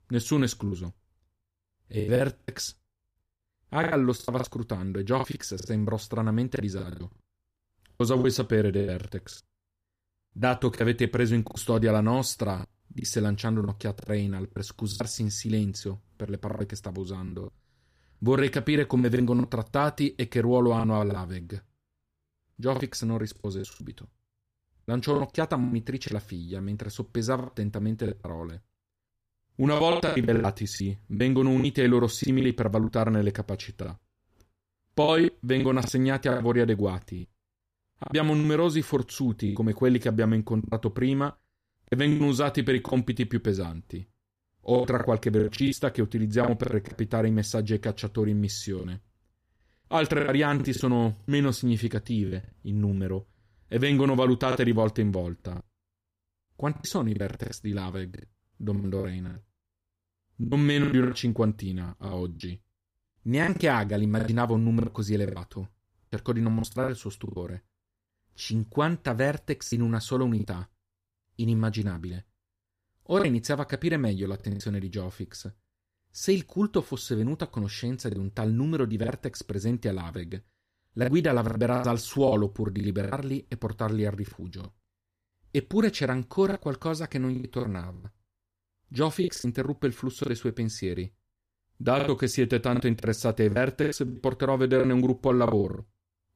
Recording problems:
choppy; very; 11% of the speech affected

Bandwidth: 15 kHz